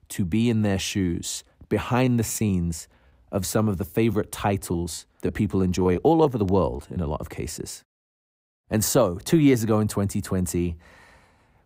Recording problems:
choppy; very; at 2 s and from 4 to 7 s; 8% of the speech affected

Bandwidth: 15.5 kHz